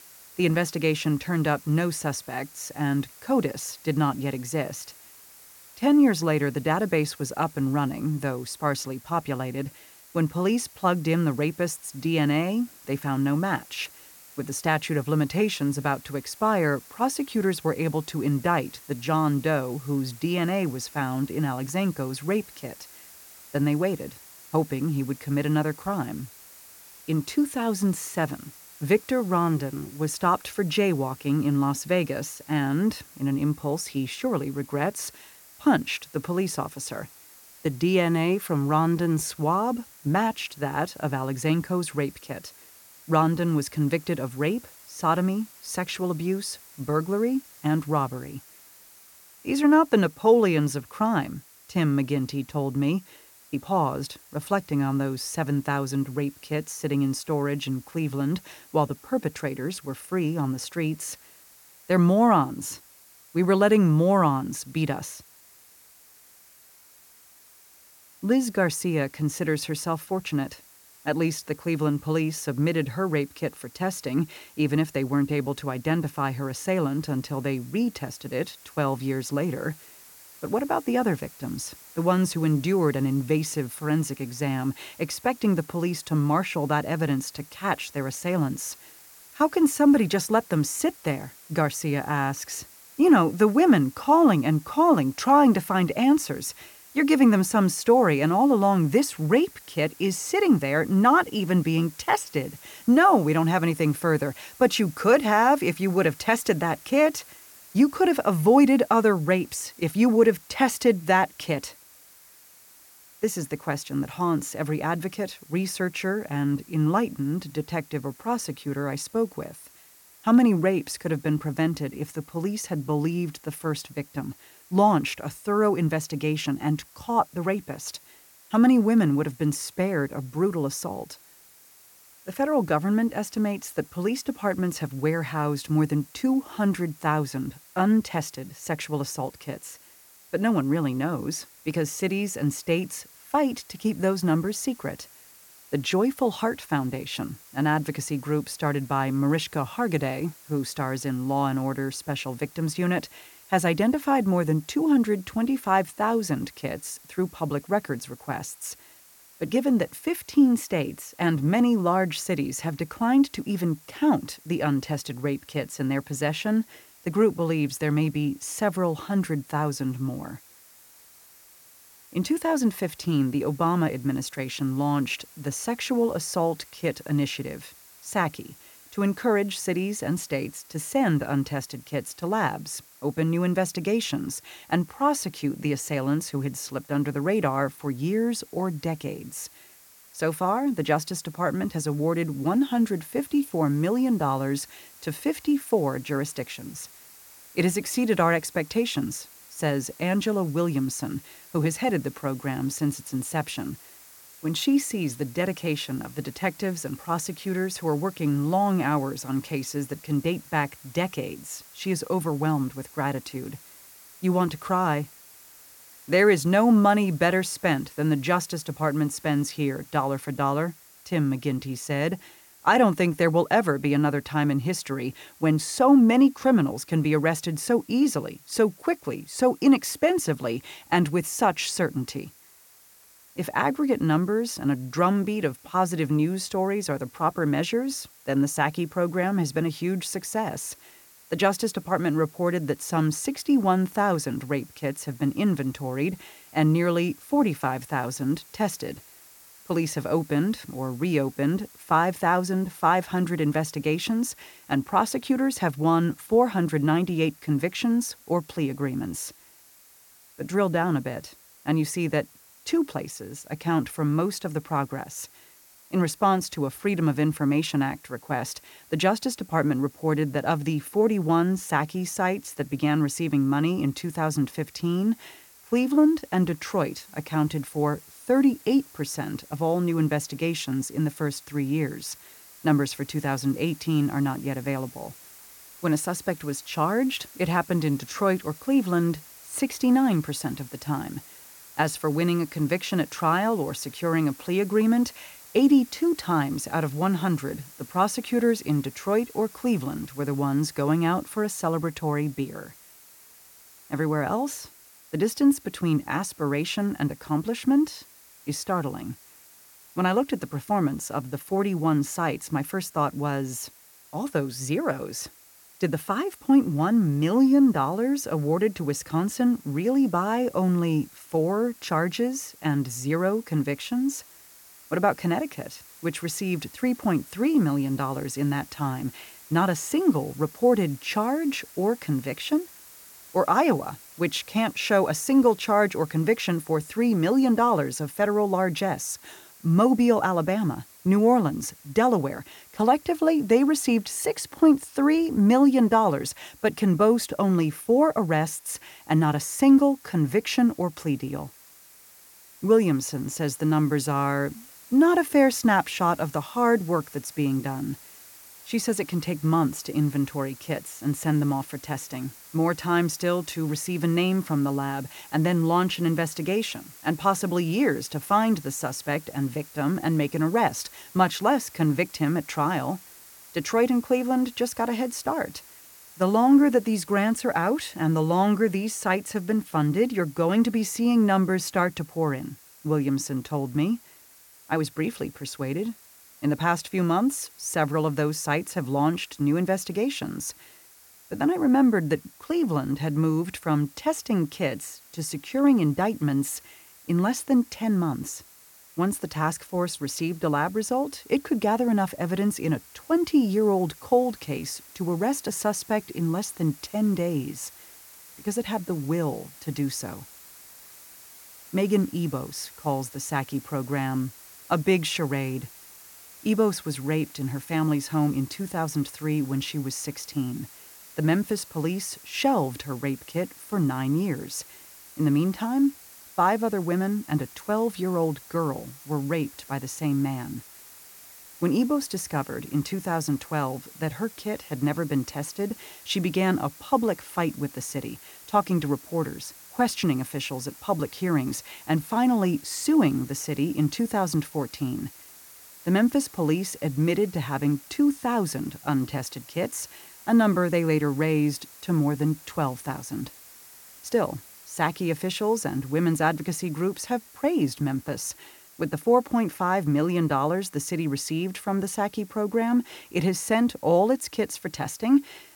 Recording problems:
hiss; faint; throughout; 20 dB below the speech

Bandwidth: 17 kHz